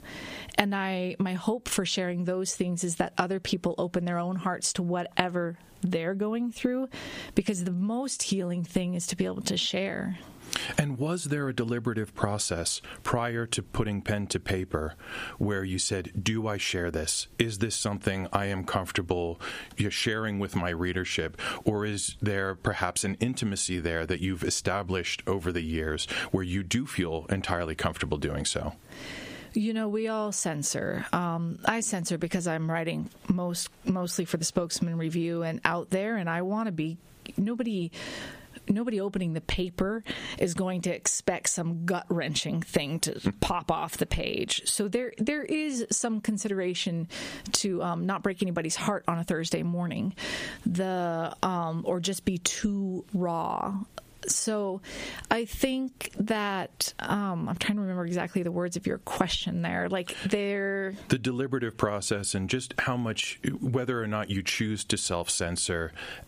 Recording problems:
squashed, flat; heavily

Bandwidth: 15 kHz